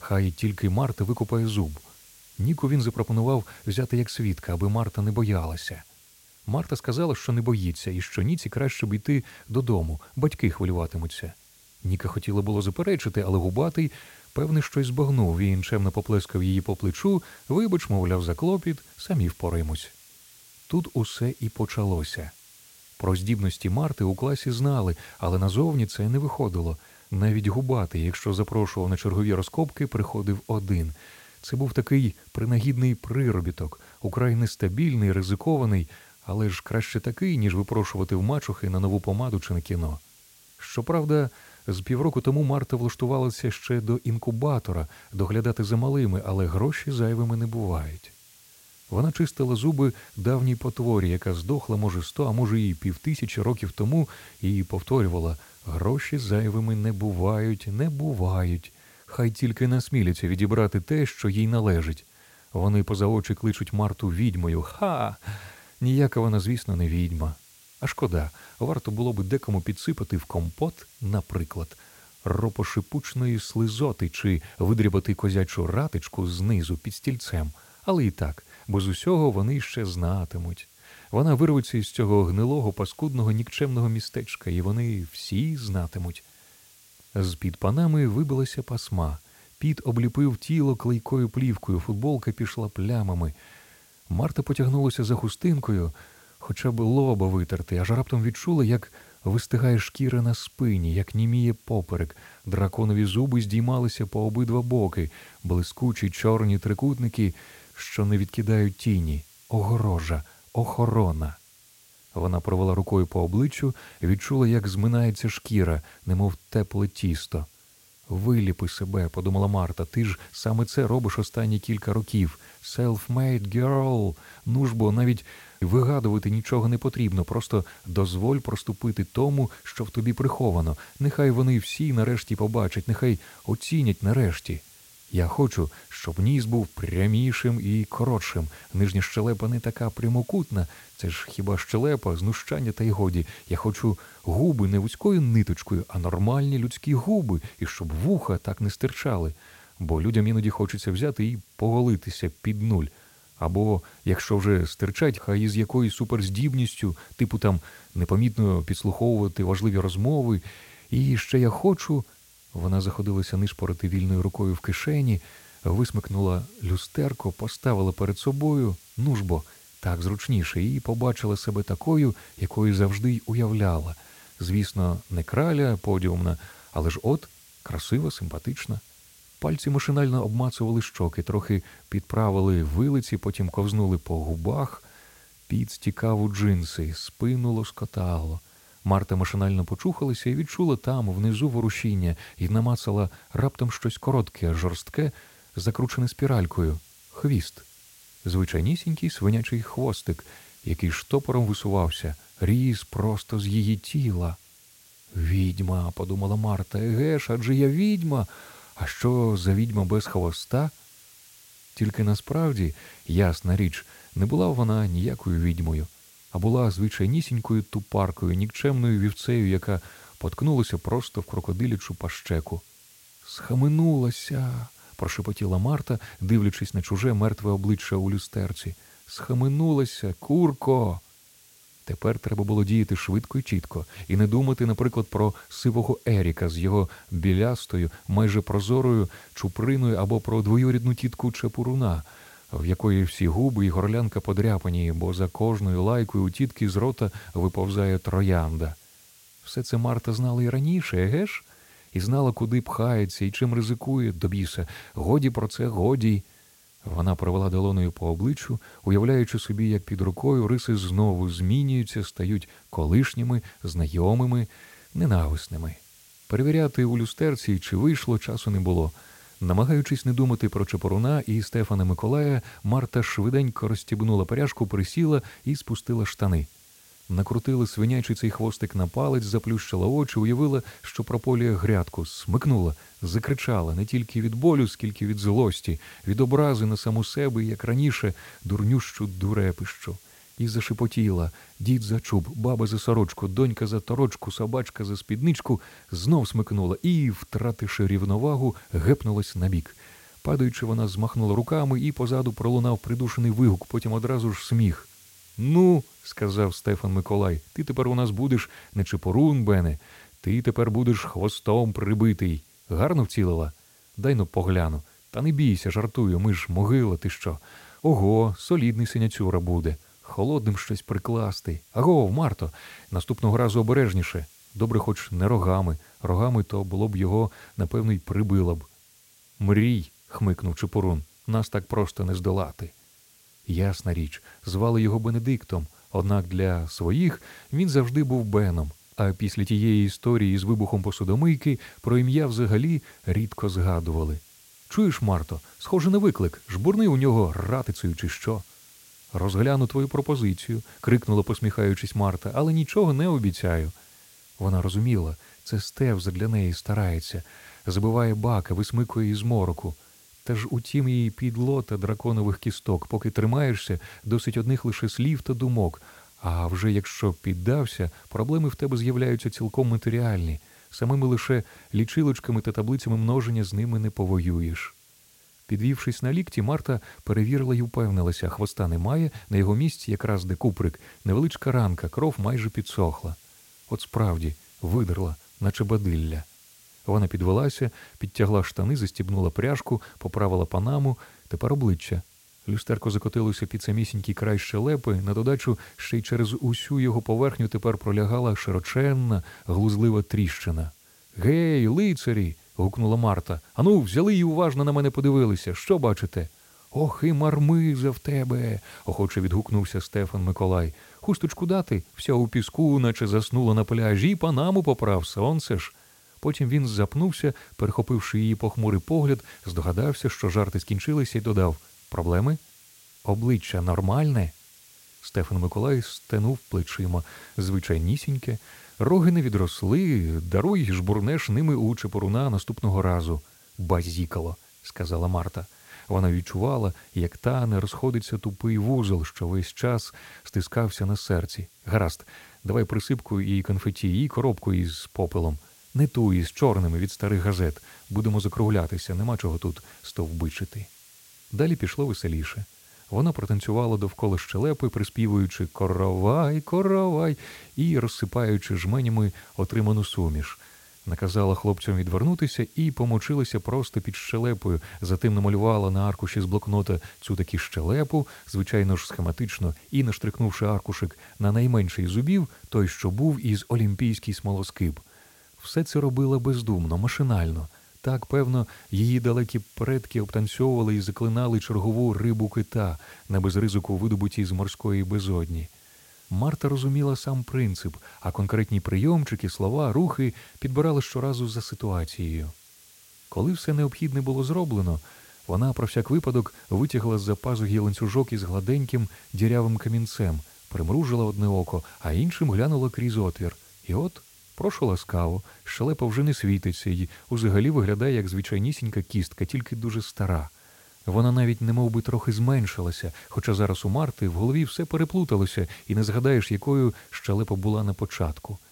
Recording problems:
hiss; faint; throughout; 25 dB below the speech

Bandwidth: 16.5 kHz